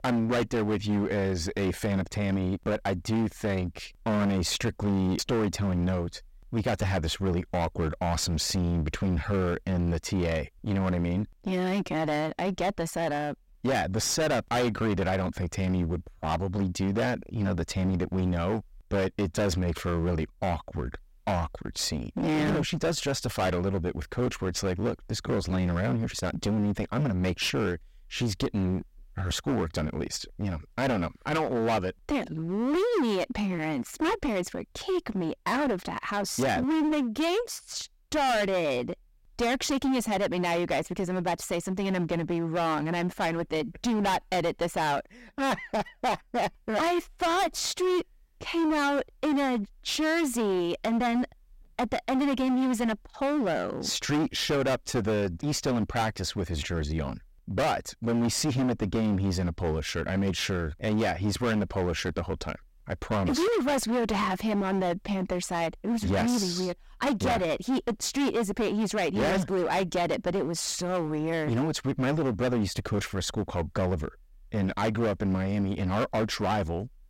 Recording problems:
distortion; heavy; 20% of the sound clipped

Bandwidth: 16 kHz